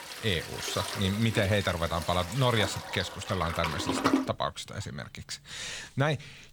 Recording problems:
household noises; loud; throughout; 4 dB below the speech

